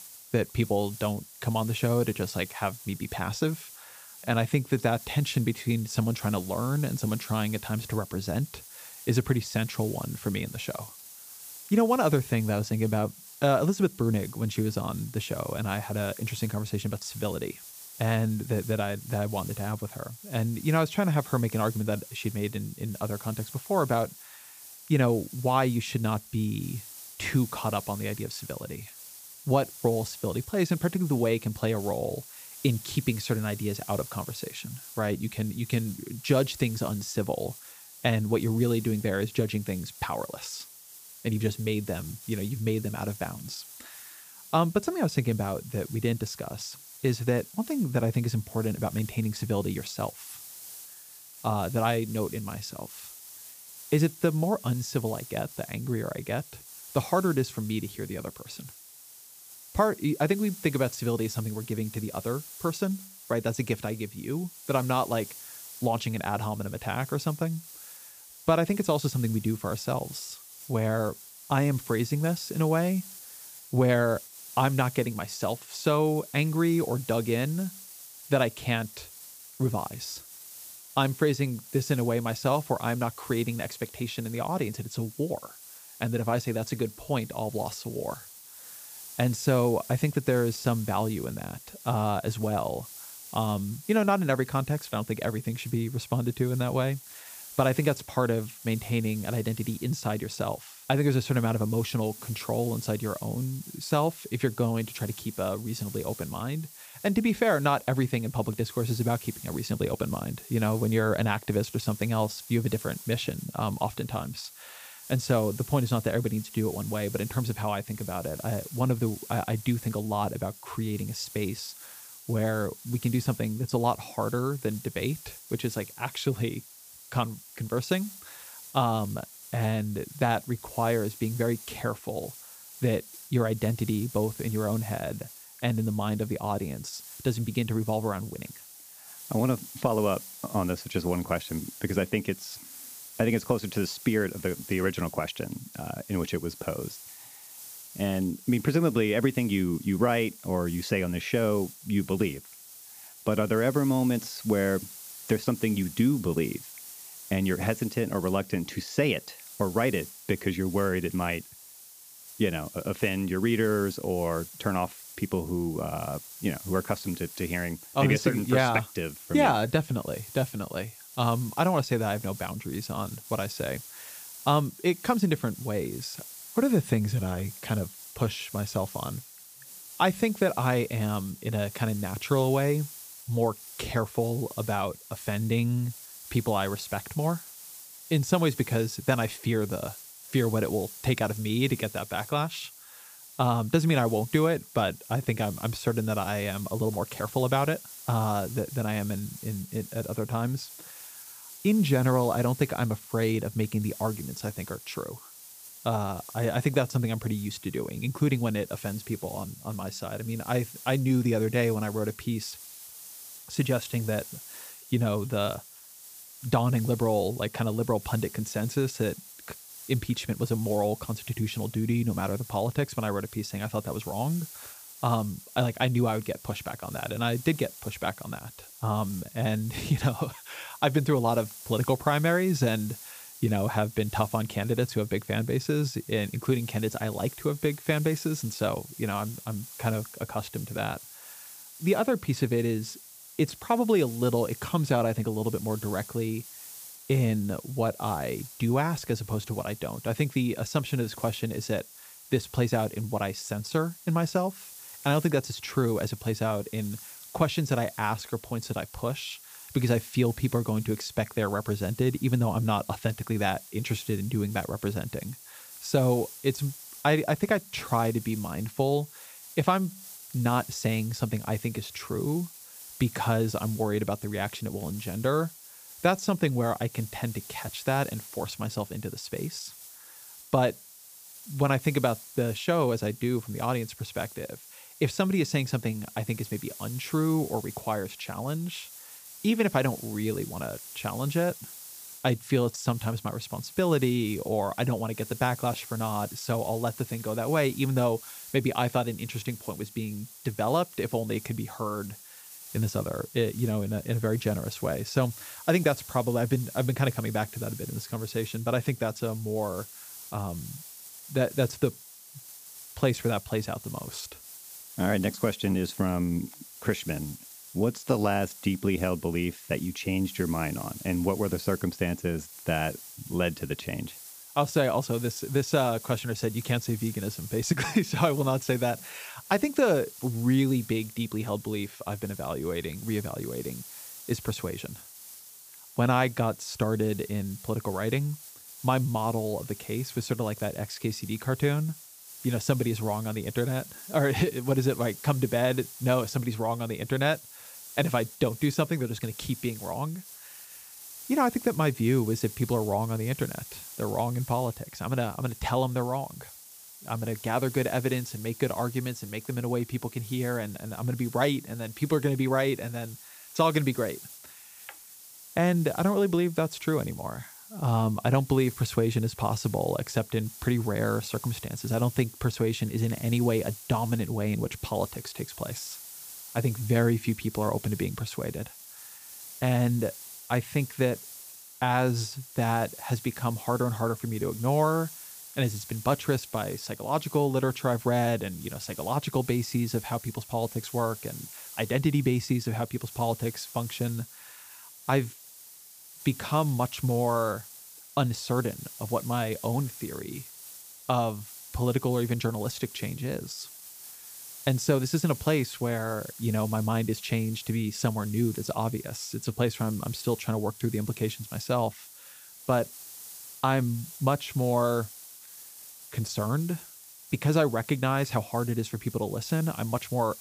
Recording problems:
hiss; noticeable; throughout; 15 dB below the speech

